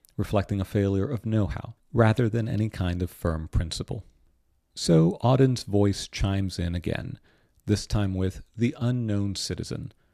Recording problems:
none

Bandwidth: 14.5 kHz